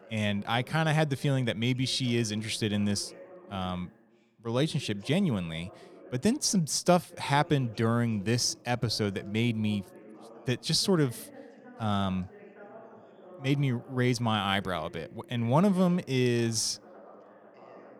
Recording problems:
background chatter; faint; throughout; 2 voices, 20 dB below the speech

